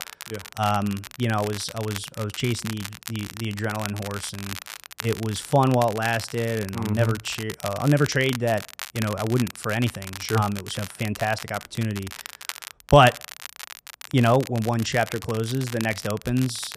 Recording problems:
crackle, like an old record; noticeable; 10 dB below the speech

